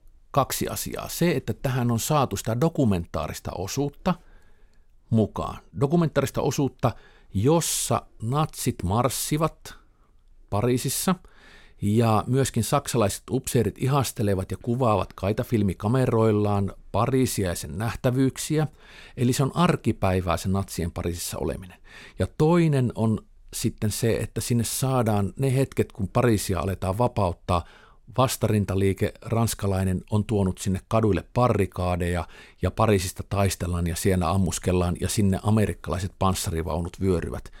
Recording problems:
none

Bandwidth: 16.5 kHz